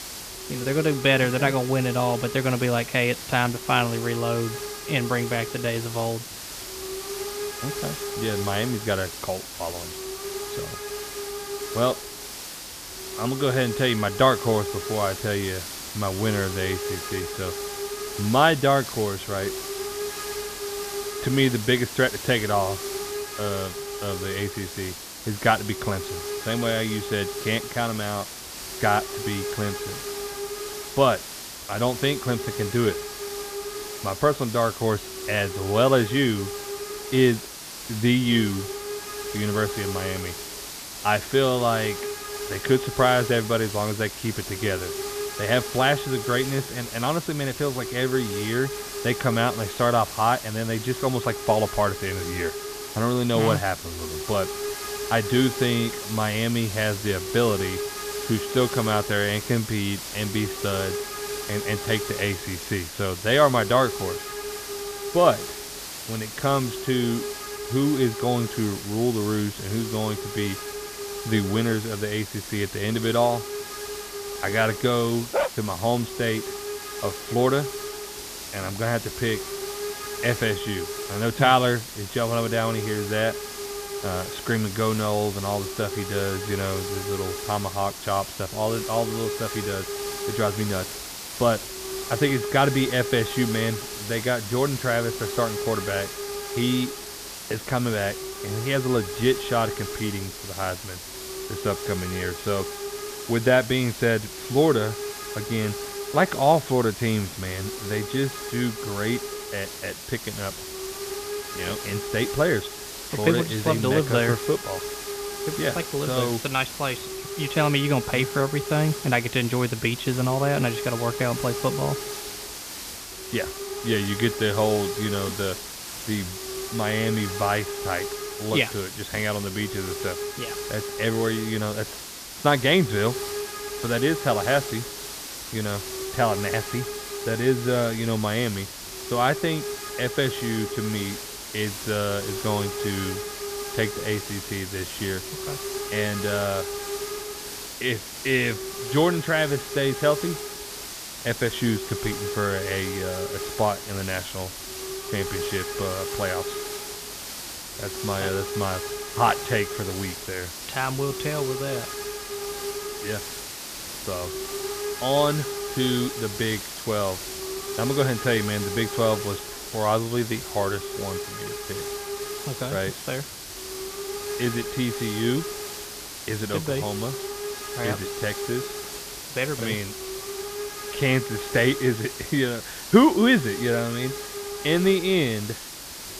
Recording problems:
high frequencies cut off; severe; nothing above 4 kHz
hiss; loud; throughout; 7 dB below the speech
dog barking; noticeable; at 1:15; peak 1 dB below the speech

